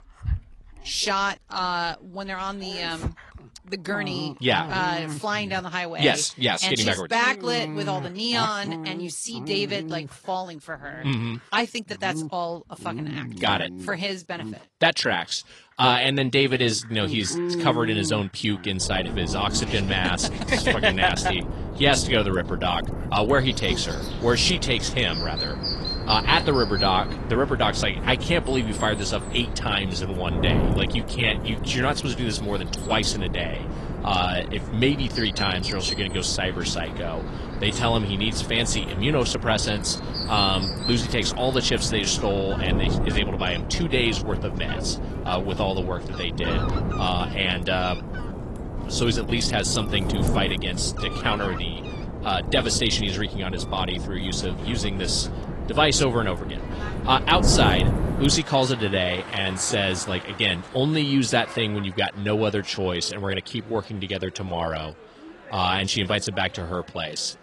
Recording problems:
garbled, watery; slightly
animal sounds; noticeable; throughout; 10 dB below the speech
wind noise on the microphone; occasional gusts; from 19 to 58 s; 15 dB below the speech

